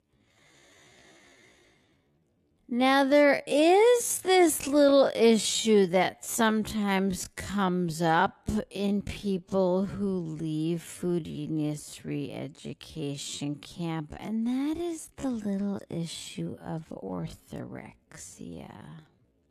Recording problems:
wrong speed, natural pitch; too slow; 0.5 times normal speed

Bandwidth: 13.5 kHz